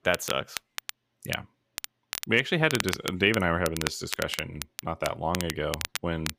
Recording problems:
crackle, like an old record; loud; 7 dB below the speech

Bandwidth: 15 kHz